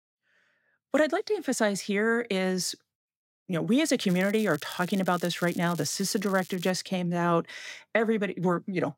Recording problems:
crackling; noticeable; from 4 to 6.5 s; 20 dB below the speech

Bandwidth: 16 kHz